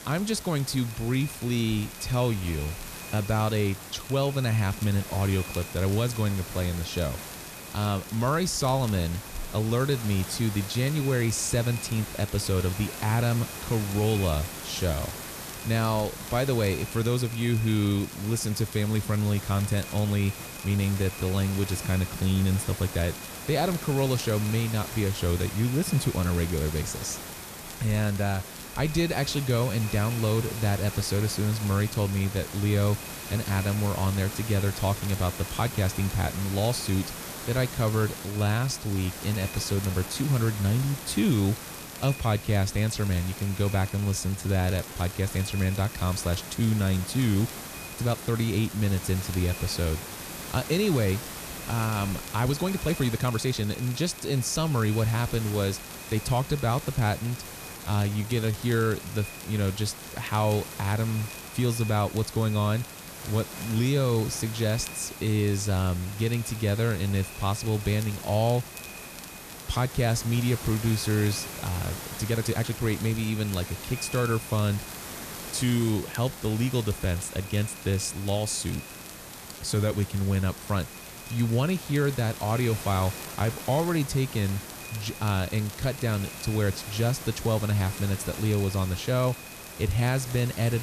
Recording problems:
echo of what is said; faint; throughout; 280 ms later, 20 dB below the speech
hiss; noticeable; throughout; 10 dB below the speech
crackle, like an old record; faint; 20 dB below the speech
uneven, jittery; strongly; from 4 s to 1:24
abrupt cut into speech; at the end

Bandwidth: 14.5 kHz